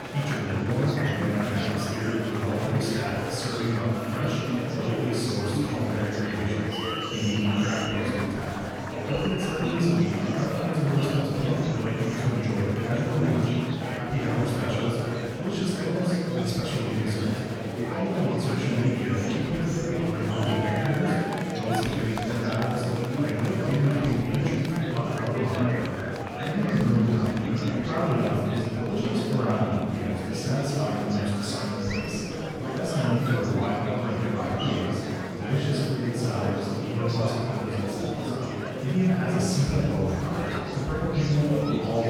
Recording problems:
room echo; strong; dies away in 2.3 s
off-mic speech; far
murmuring crowd; loud; throughout; 4 dB below the speech
abrupt cut into speech; at the end

